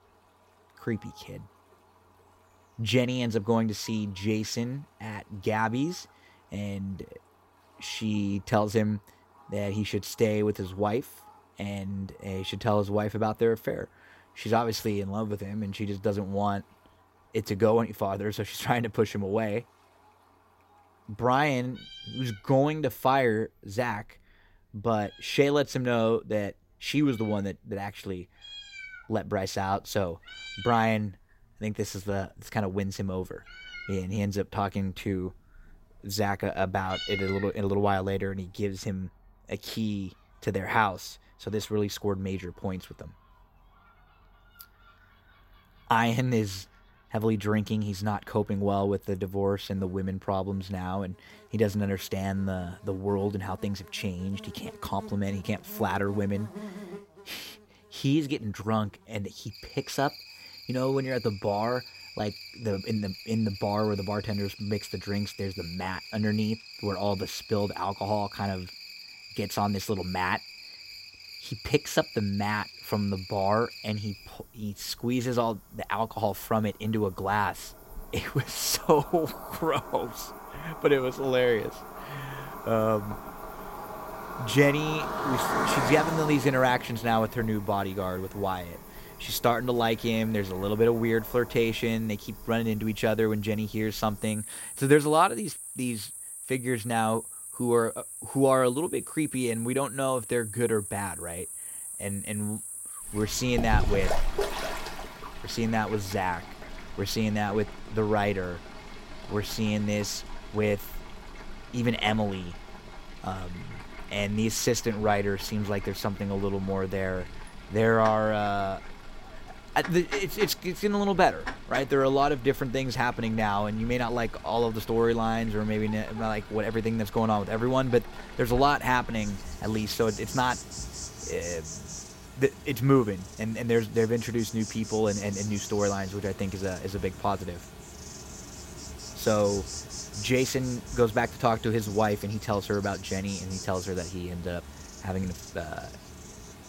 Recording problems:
animal sounds; noticeable; throughout; 10 dB below the speech

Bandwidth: 16 kHz